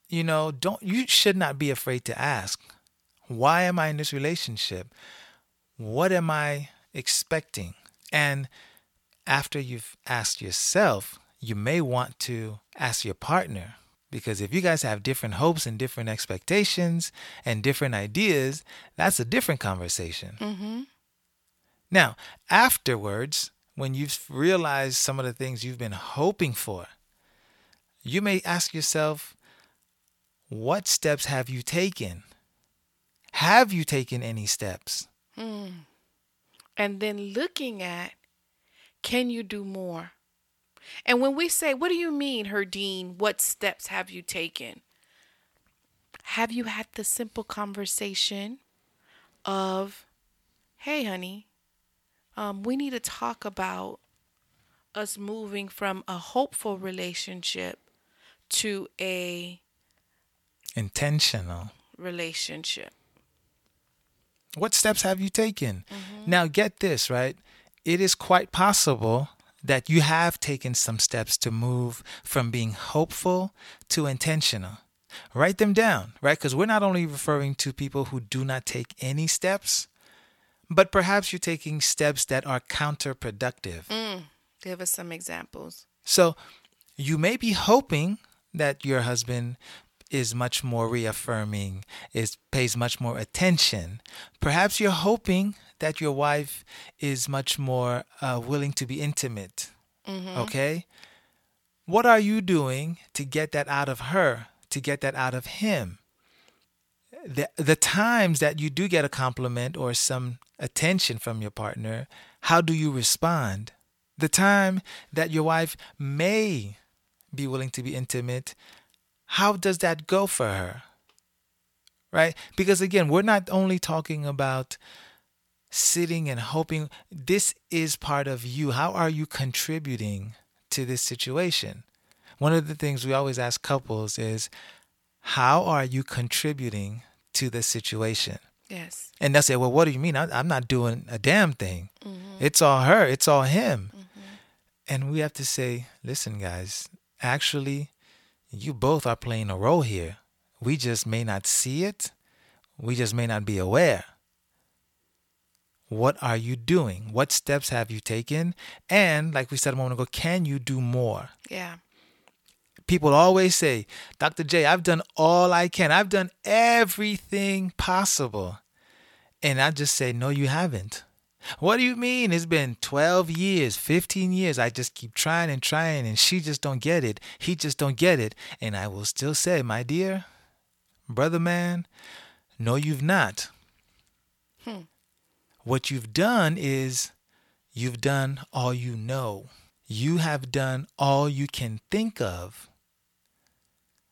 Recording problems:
none

